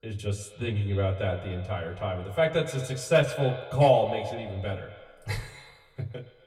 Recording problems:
off-mic speech; far
echo of what is said; noticeable; throughout; 120 ms later, 10 dB below the speech
room echo; very slight; dies away in 0.2 s

